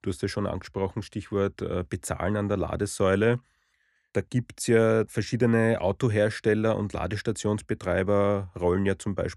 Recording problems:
none

